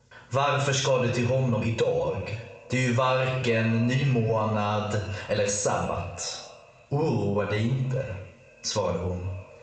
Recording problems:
squashed, flat; heavily
echo of what is said; noticeable; throughout; 220 ms later, 15 dB below the speech
room echo; noticeable; dies away in 0.6 s
high frequencies cut off; noticeable; nothing above 8 kHz
off-mic speech; somewhat distant
uneven, jittery; strongly; from 1 to 9 s

